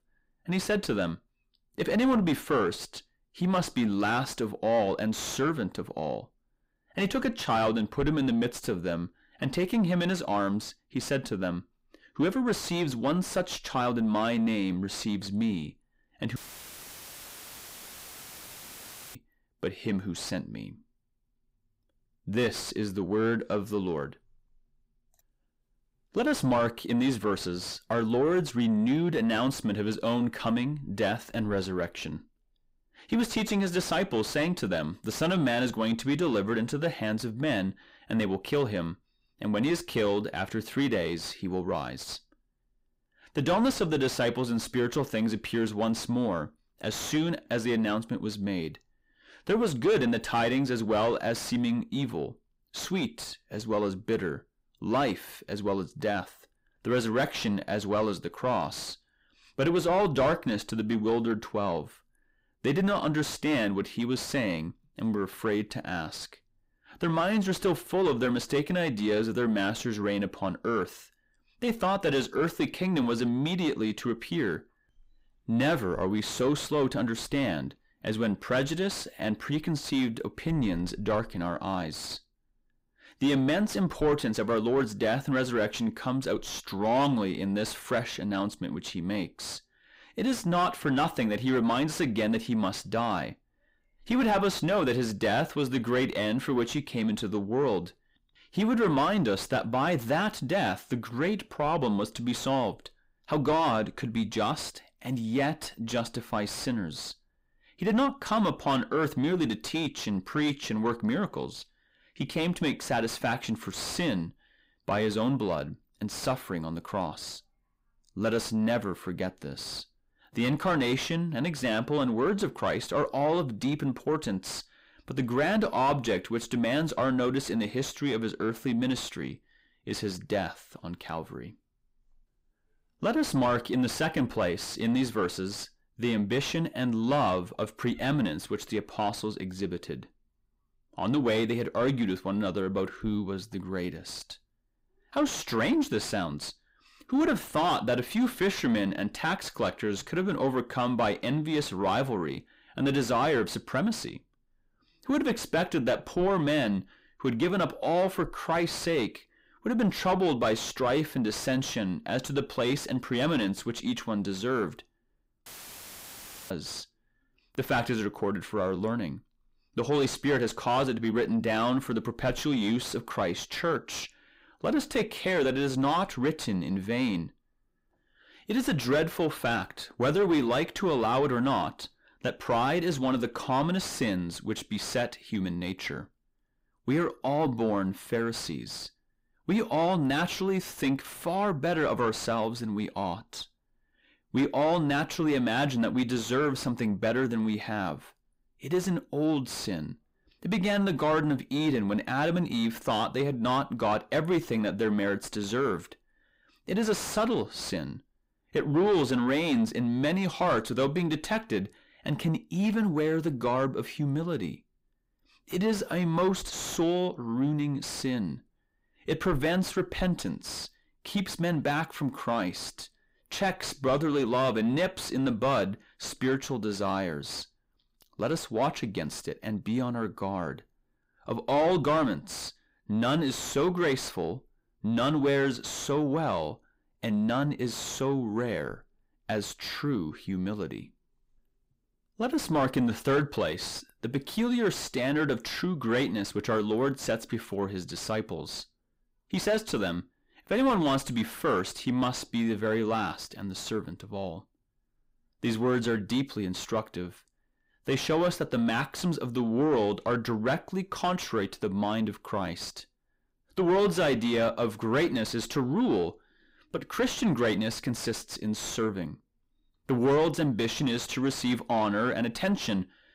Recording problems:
distortion; heavy; 7 dB below the speech
audio cutting out; filled with static; at 16 s for 3 s and at 2:45 for 1 s

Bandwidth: 15.5 kHz